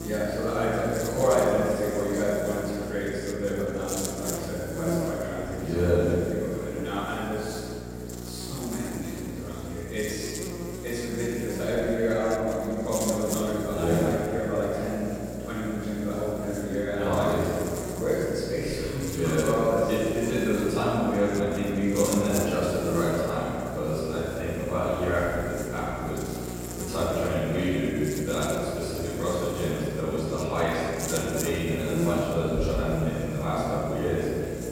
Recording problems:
room echo; strong; dies away in 2.4 s
off-mic speech; far
electrical hum; noticeable; throughout; 60 Hz, 10 dB below the speech

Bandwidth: 16 kHz